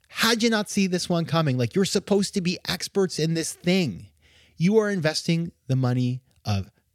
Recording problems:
none

